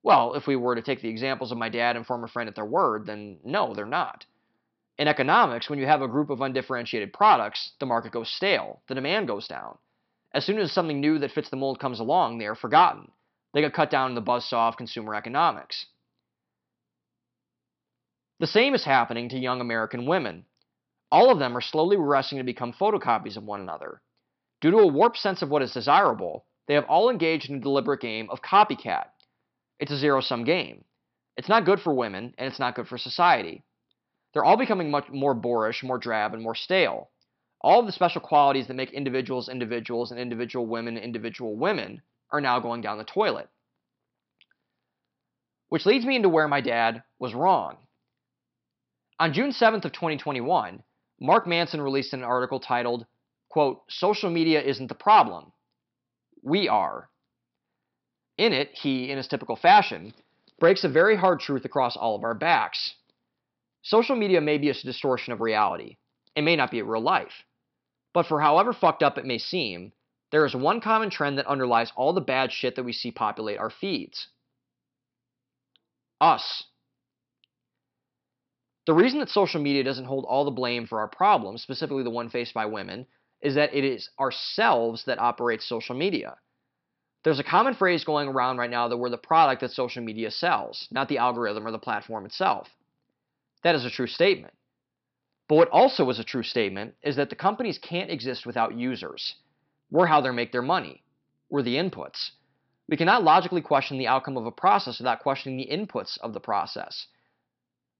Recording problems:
high frequencies cut off; noticeable; nothing above 5.5 kHz

